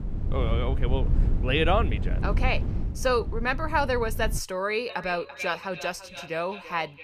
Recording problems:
echo of what is said; strong; from 5 s on; 340 ms later, 10 dB below the speech
wind noise on the microphone; occasional gusts; until 4.5 s; 15 dB below the speech

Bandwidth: 15 kHz